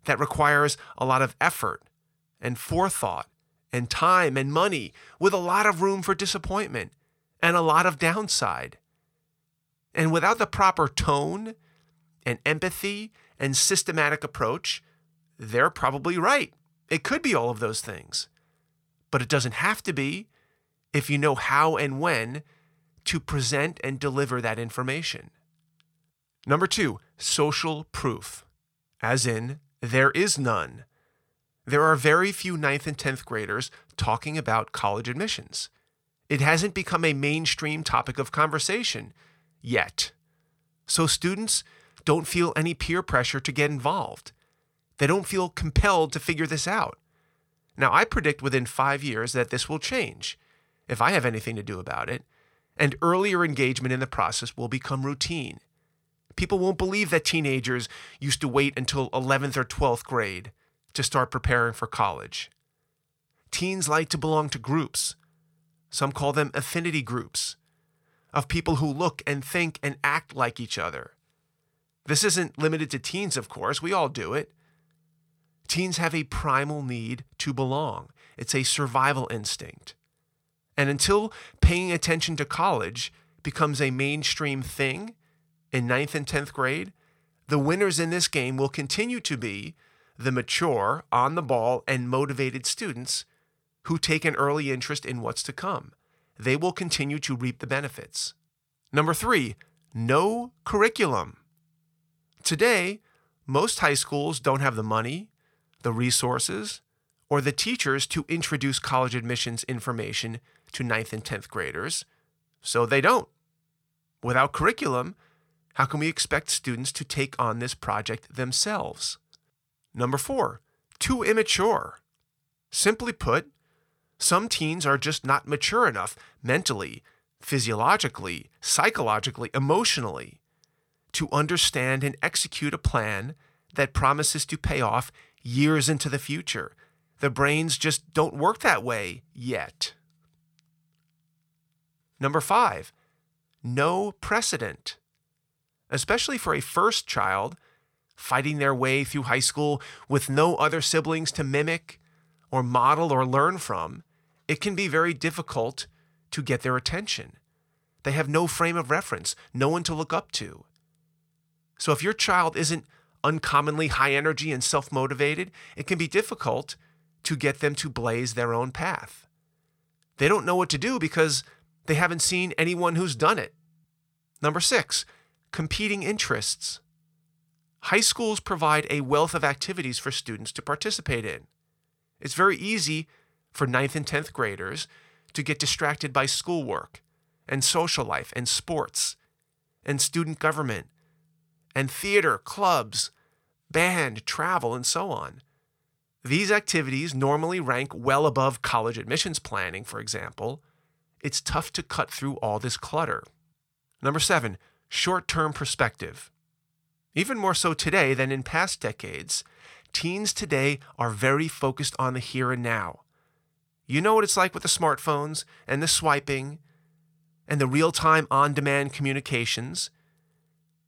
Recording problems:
none

